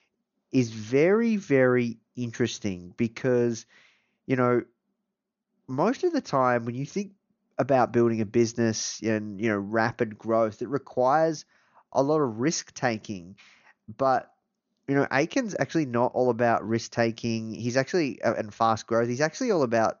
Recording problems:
high frequencies cut off; noticeable; nothing above 6.5 kHz

